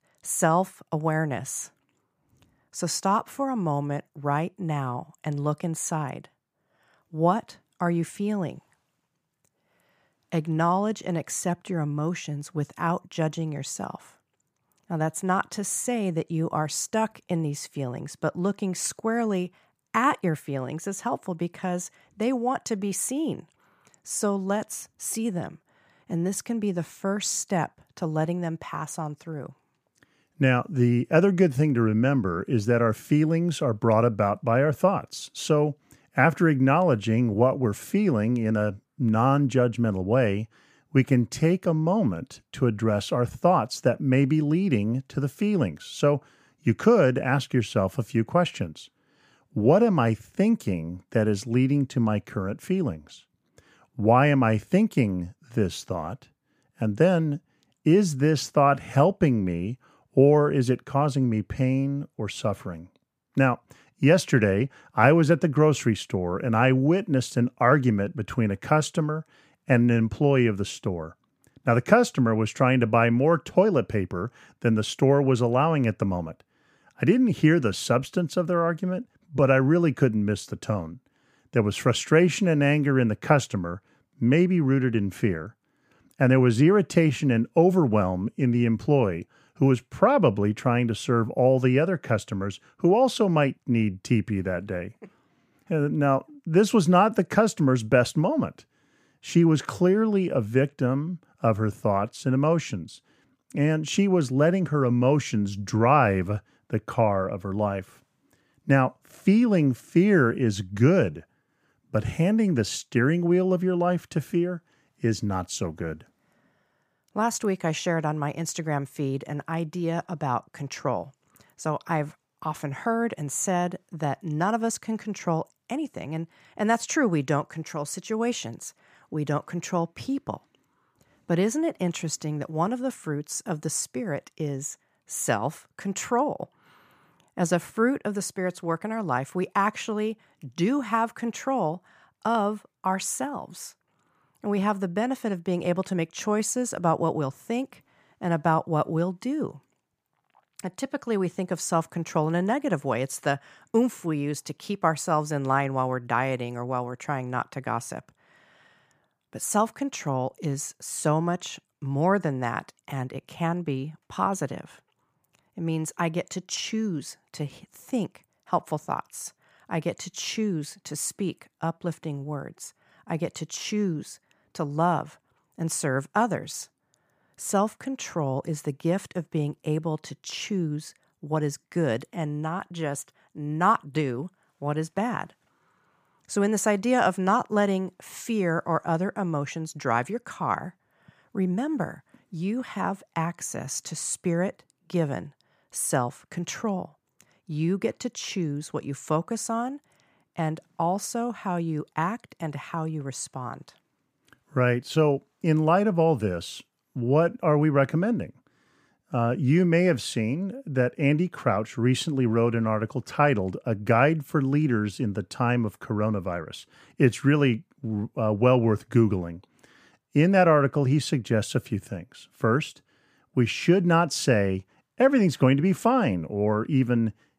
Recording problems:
none

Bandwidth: 15 kHz